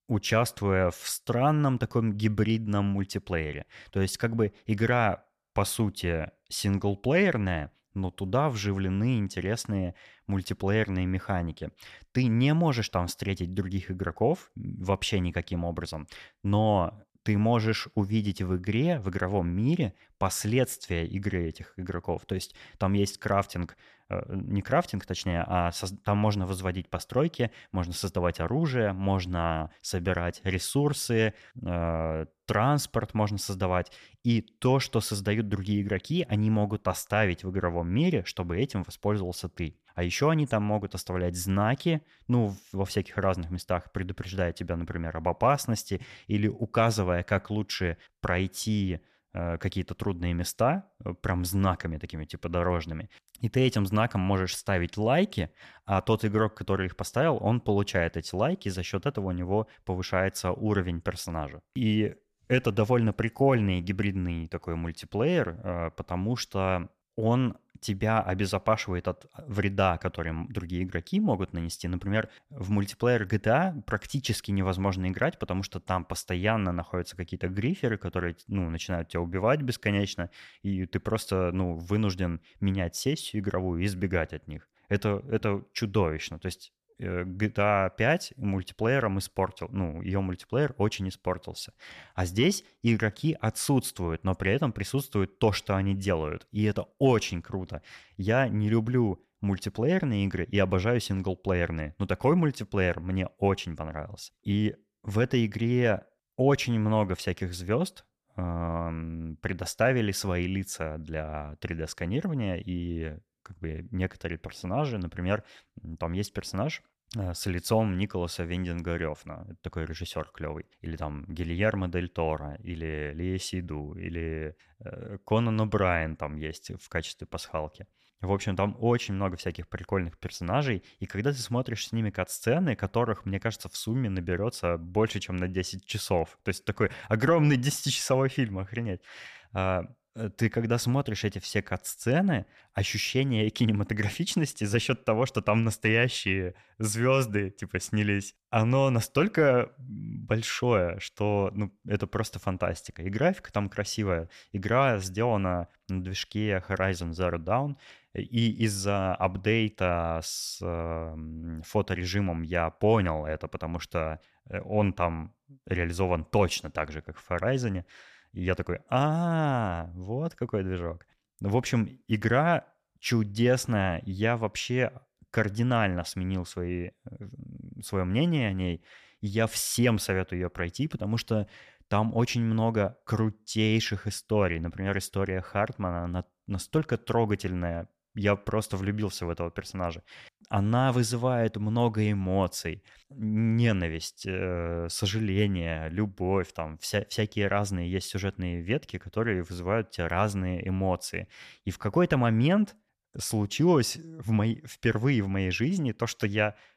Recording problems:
none

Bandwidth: 14.5 kHz